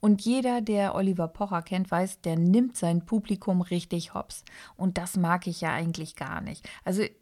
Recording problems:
none

